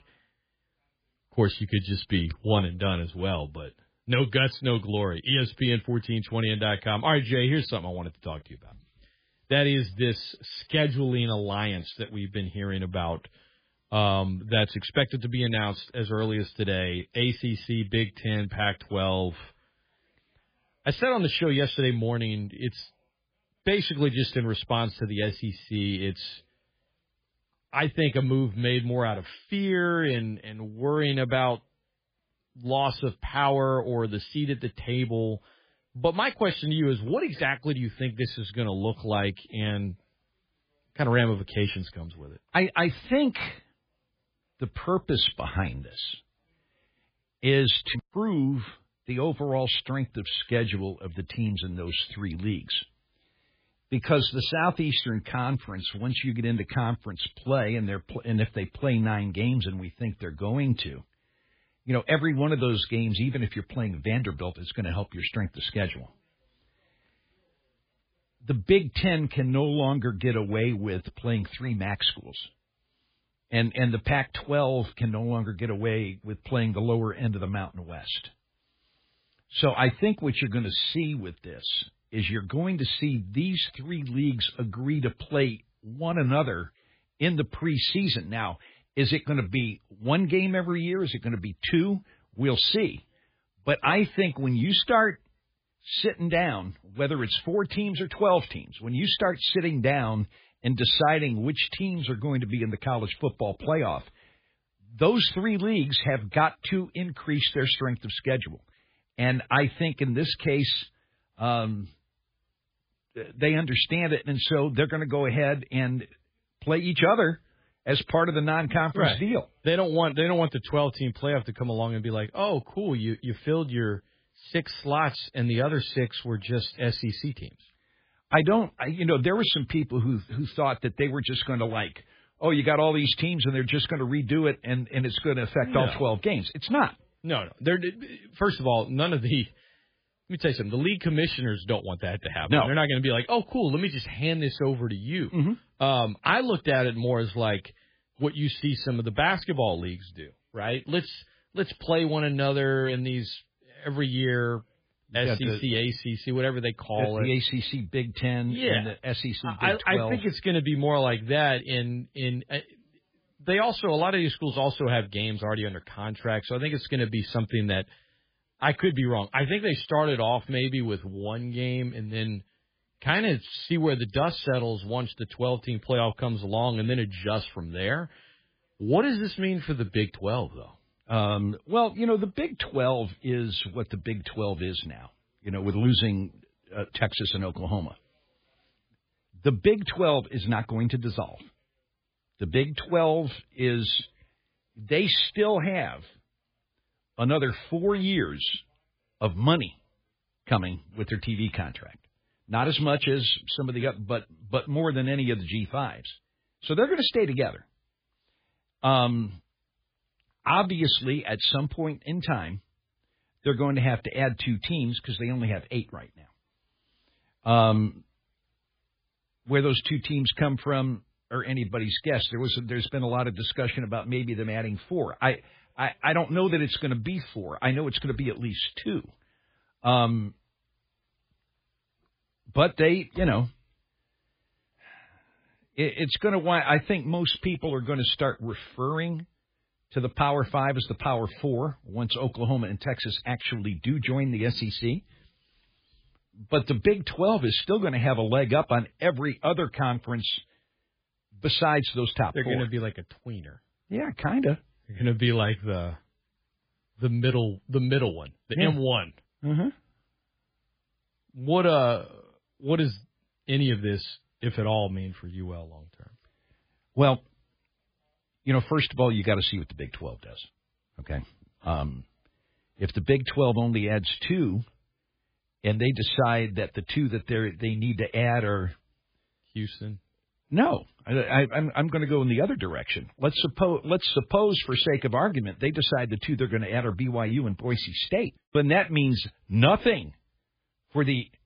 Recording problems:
garbled, watery; badly; nothing above 4 kHz

